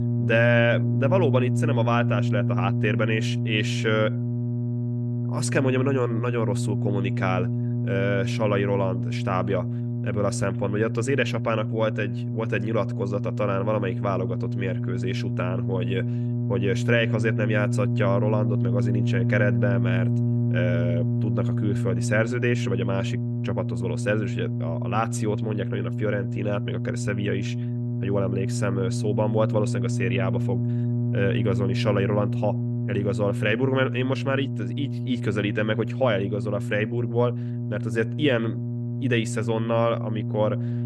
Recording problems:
electrical hum; loud; throughout; 60 Hz, 8 dB below the speech

